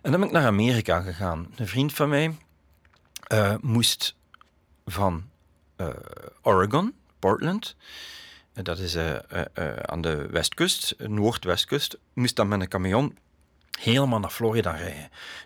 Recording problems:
none

